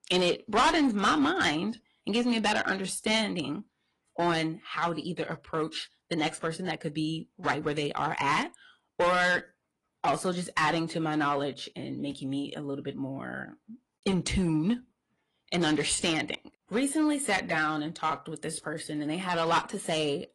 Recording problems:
distortion; heavy; 4% of the sound clipped
garbled, watery; slightly; nothing above 10.5 kHz

